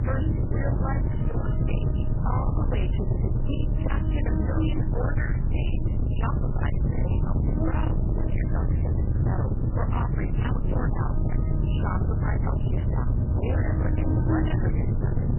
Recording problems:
distortion; heavy; 57% of the sound clipped
garbled, watery; badly; nothing above 3 kHz
electrical hum; loud; throughout; 60 Hz, 7 dB below the speech
low rumble; loud; throughout; 2 dB below the speech
uneven, jittery; strongly; from 1 to 13 s

